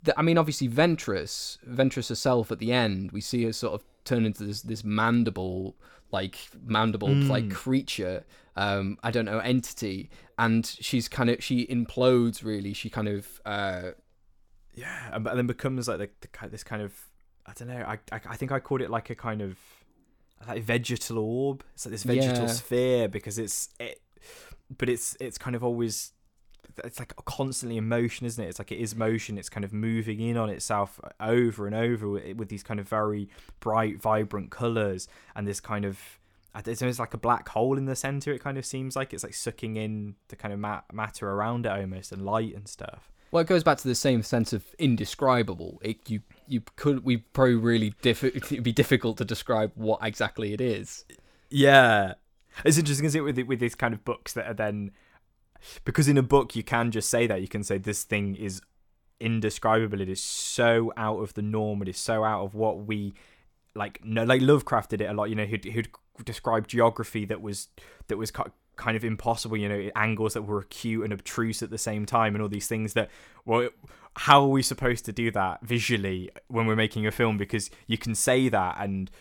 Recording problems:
none

